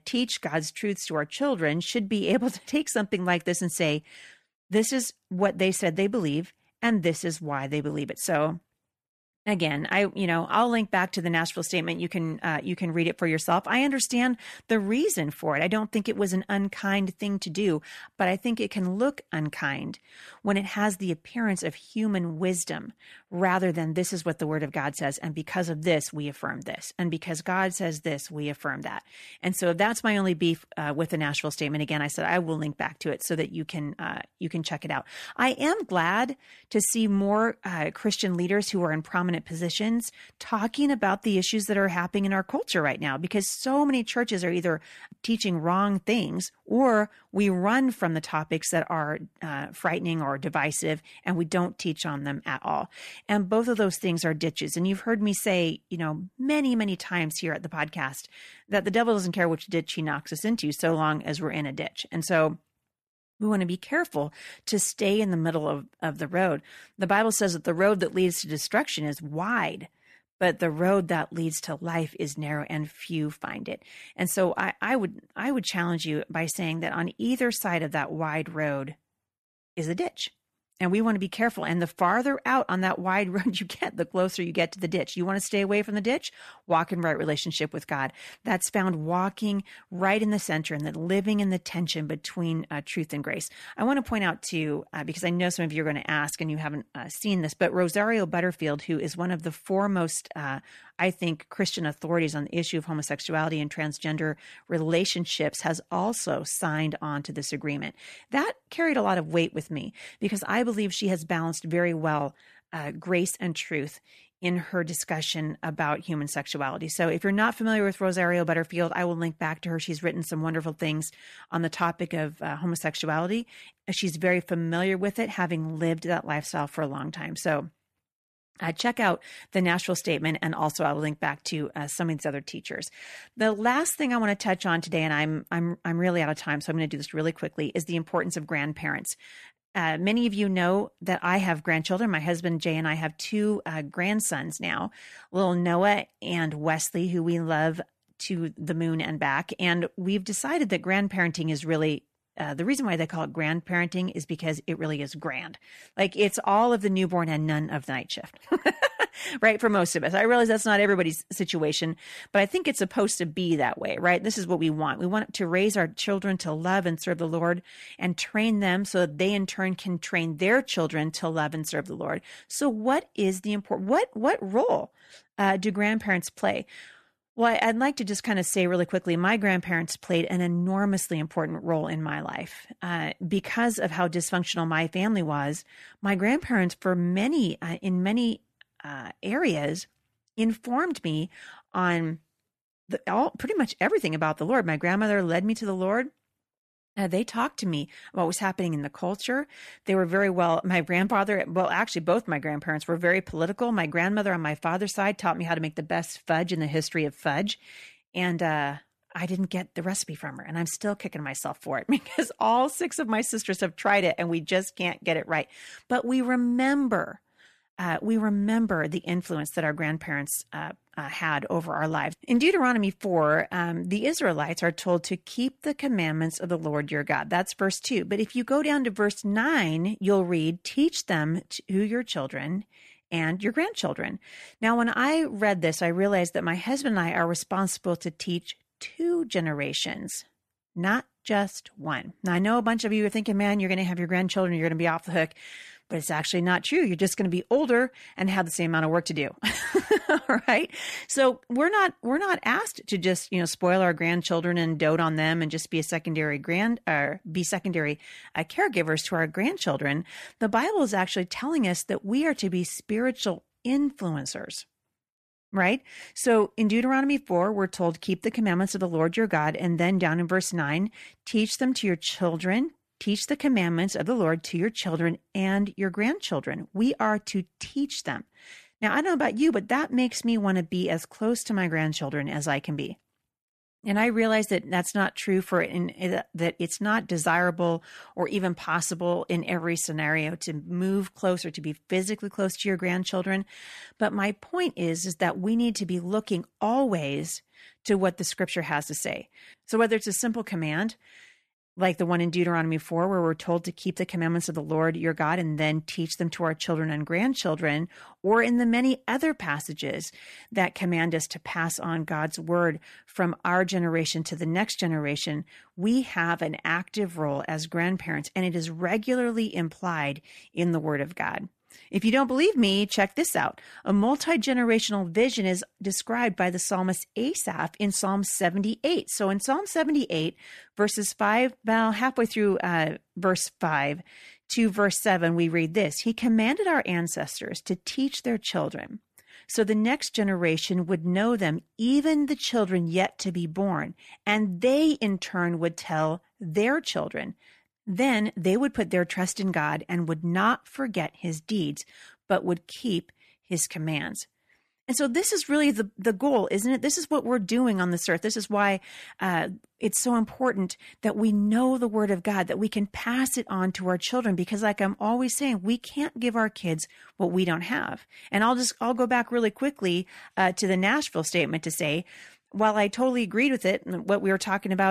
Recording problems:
abrupt cut into speech; at the end

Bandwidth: 14 kHz